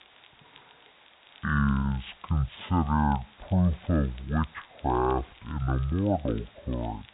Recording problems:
high frequencies cut off; severe; nothing above 4 kHz
wrong speed and pitch; too slow and too low; 0.6 times normal speed
hiss; faint; throughout; 25 dB below the speech
crackle, like an old record; faint; 30 dB below the speech

